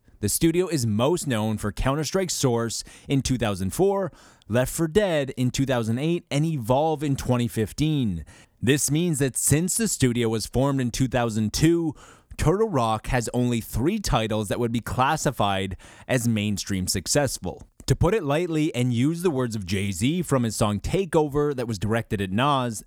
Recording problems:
none

